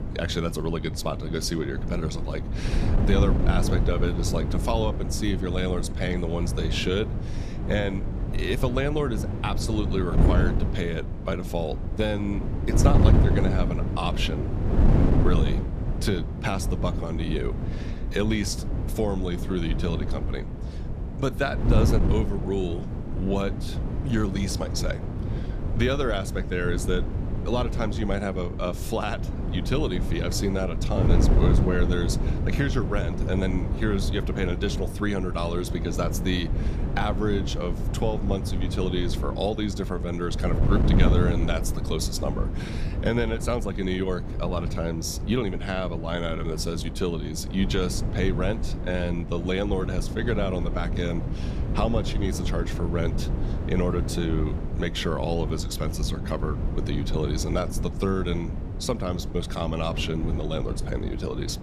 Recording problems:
wind noise on the microphone; heavy; 7 dB below the speech

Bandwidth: 14.5 kHz